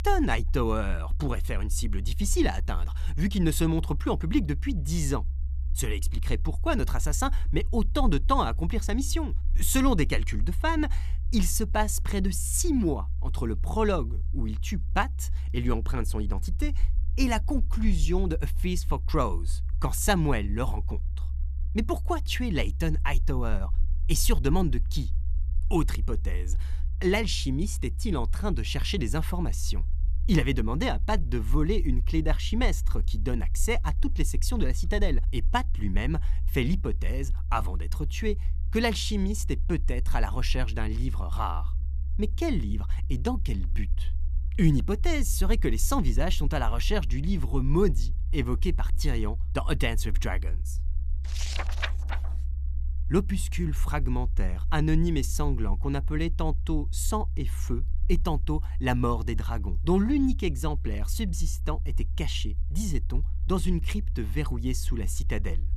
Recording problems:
low rumble; faint; throughout; 20 dB below the speech

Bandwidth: 13.5 kHz